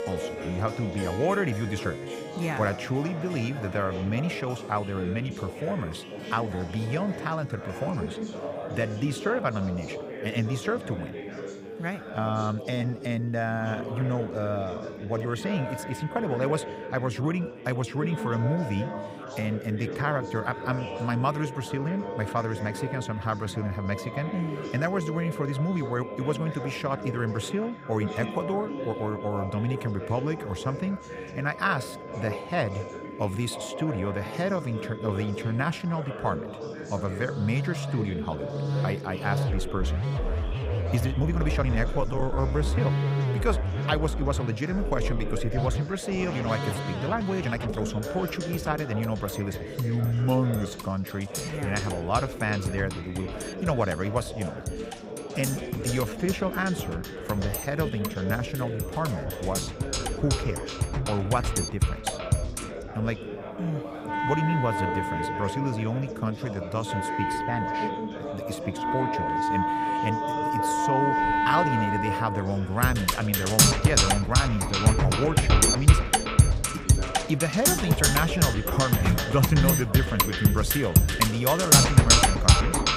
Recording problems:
background music; very loud; throughout; 3 dB above the speech
chatter from many people; loud; throughout; 8 dB below the speech
rain or running water; faint; throughout; 20 dB below the speech
uneven, jittery; strongly; from 13 s to 1:11

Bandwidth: 15.5 kHz